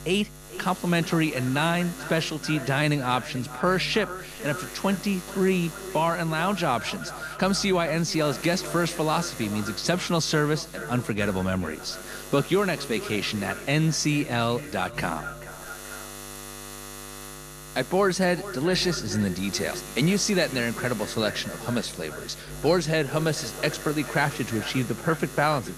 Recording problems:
echo of what is said; noticeable; throughout; 440 ms later, 15 dB below the speech
electrical hum; noticeable; throughout; 60 Hz, 15 dB below the speech

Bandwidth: 14.5 kHz